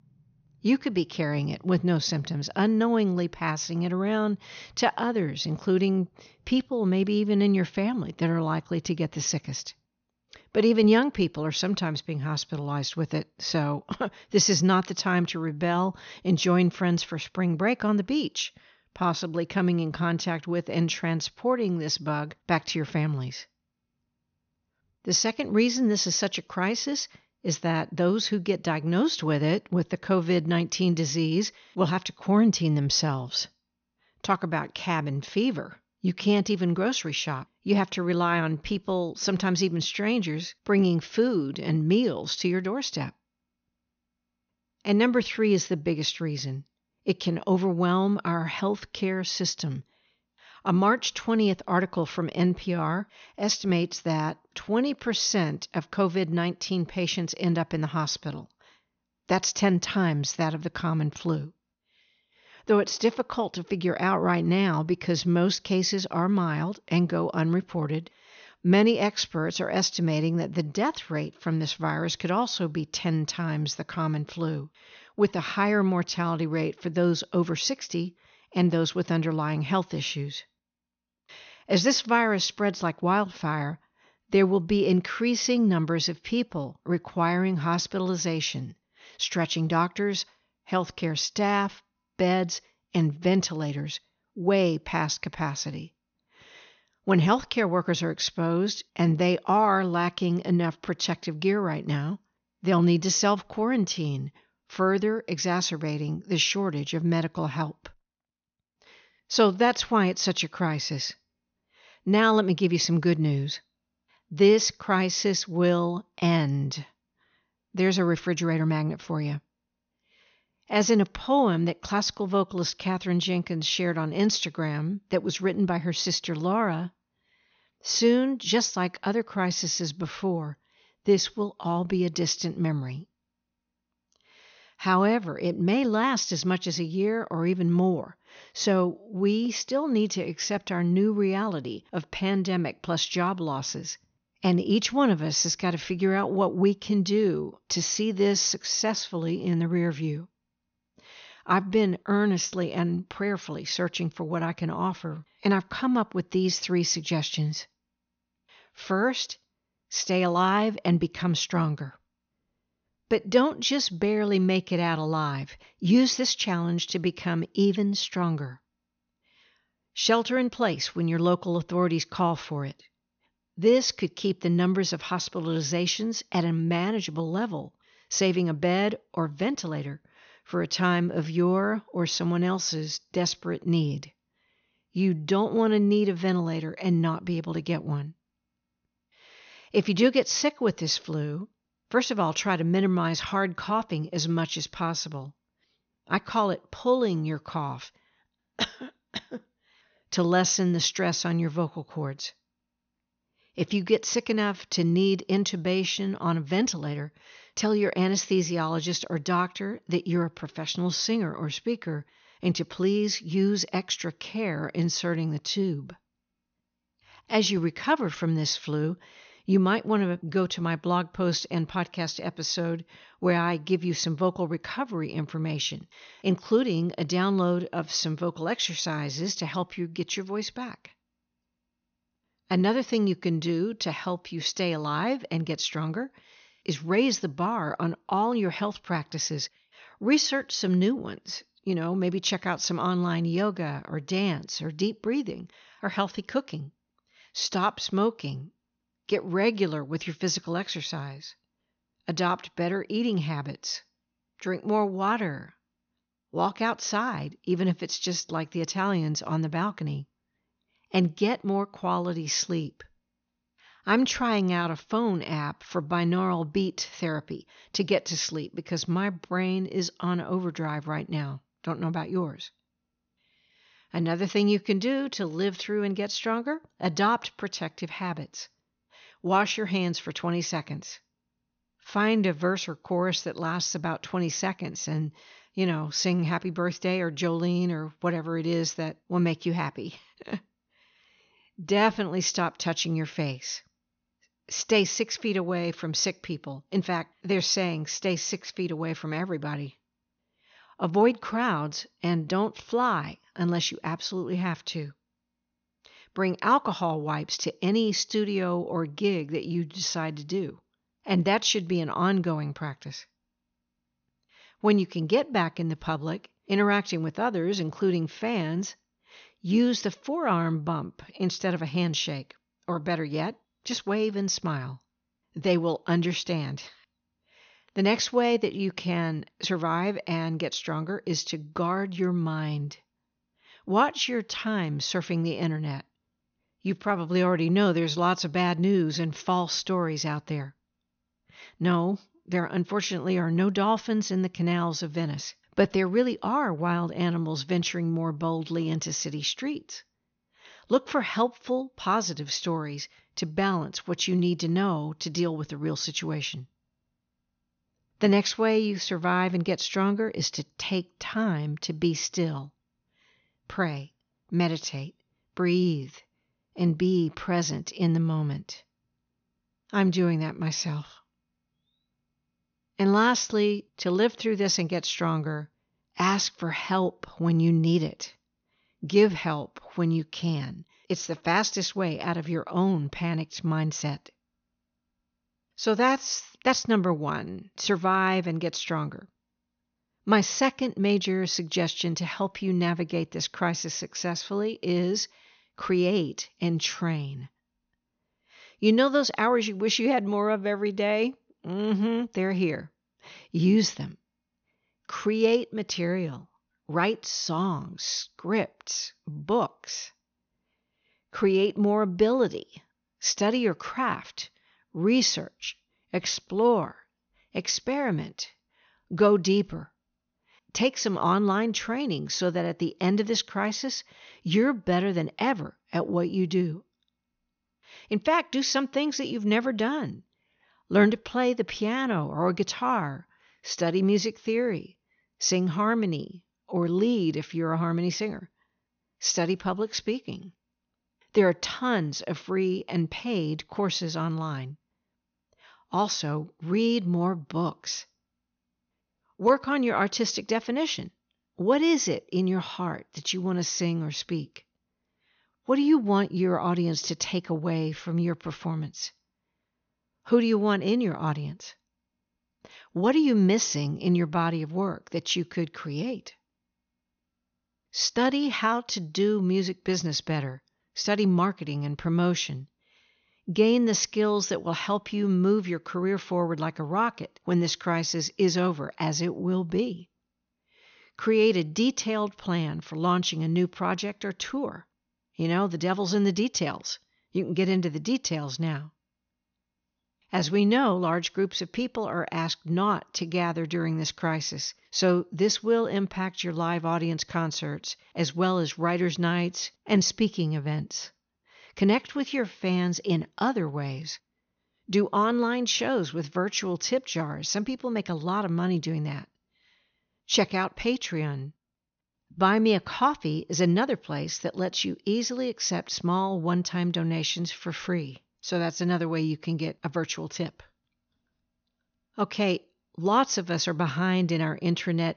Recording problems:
high frequencies cut off; noticeable; nothing above 6.5 kHz

